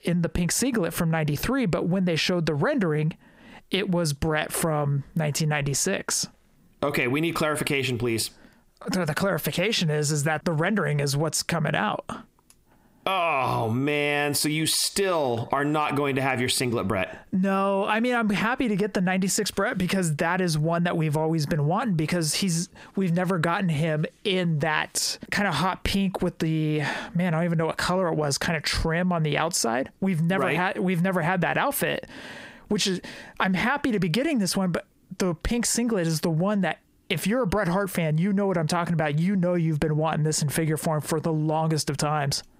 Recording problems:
squashed, flat; heavily

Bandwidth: 15.5 kHz